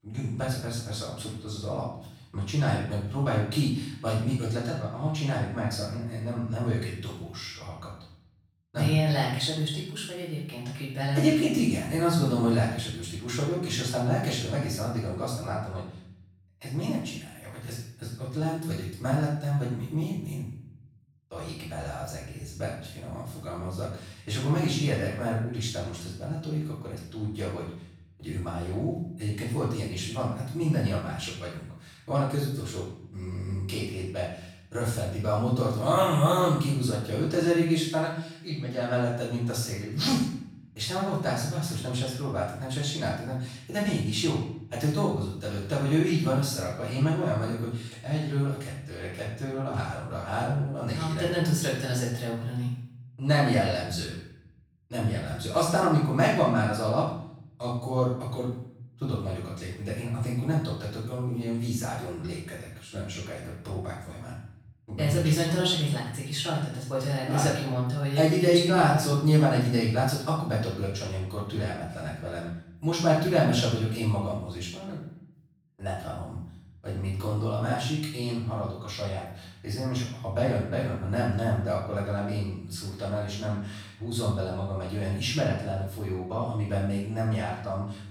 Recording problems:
off-mic speech; far
room echo; noticeable; dies away in 0.6 s

